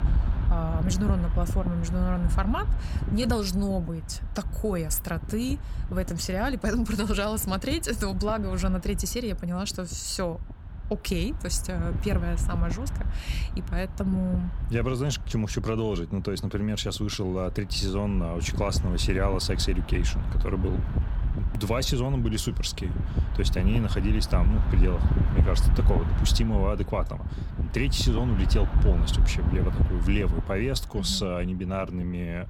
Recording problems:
wind noise on the microphone; occasional gusts; 10 dB below the speech

